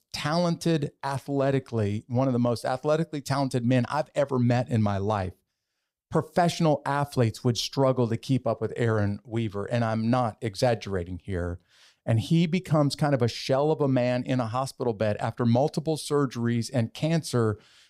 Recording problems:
none

